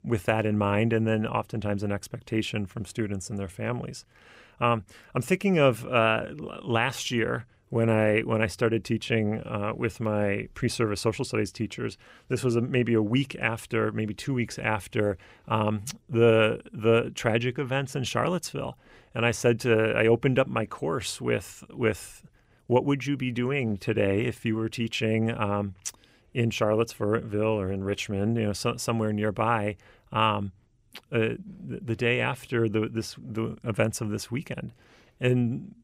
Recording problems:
none

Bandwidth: 15.5 kHz